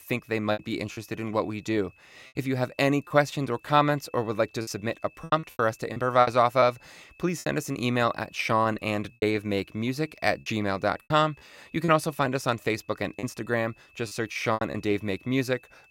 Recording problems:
high-pitched whine; faint; throughout; 2.5 kHz, 30 dB below the speech
choppy; very; 8% of the speech affected

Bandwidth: 16 kHz